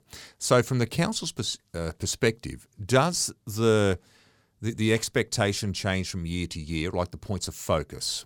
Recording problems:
none

